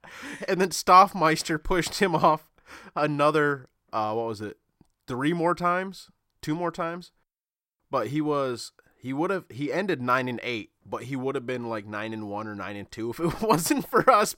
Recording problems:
none

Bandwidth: 16 kHz